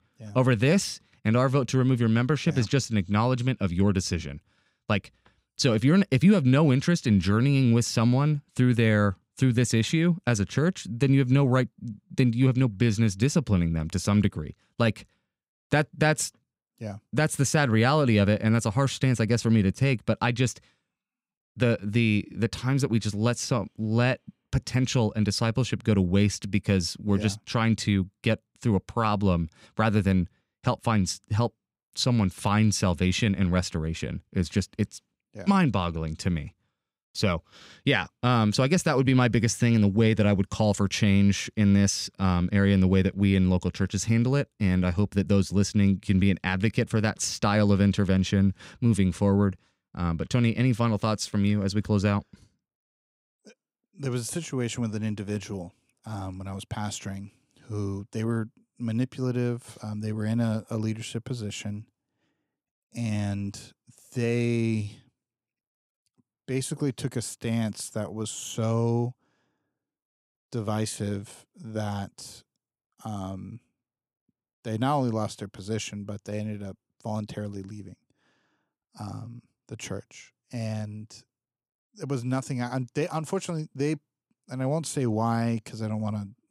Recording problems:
none

